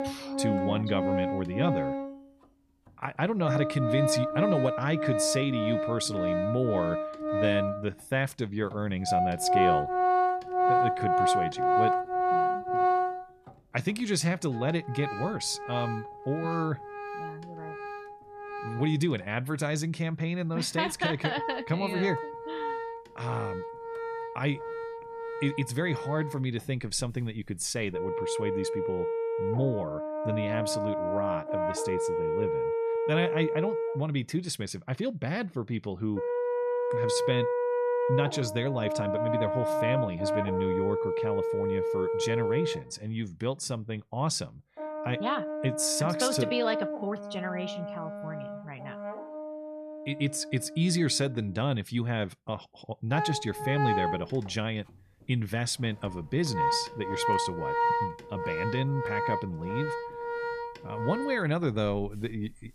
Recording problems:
background music; very loud; throughout; as loud as the speech

